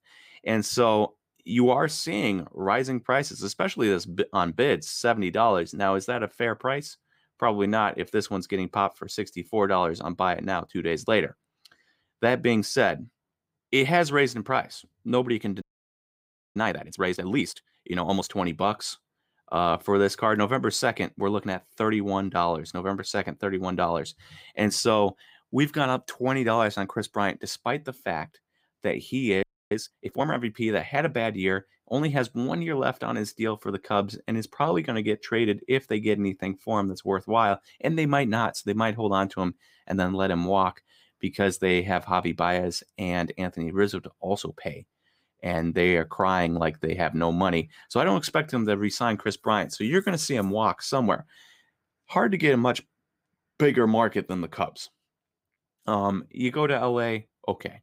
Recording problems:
audio freezing; at 16 s for 1 s and at 29 s

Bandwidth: 15.5 kHz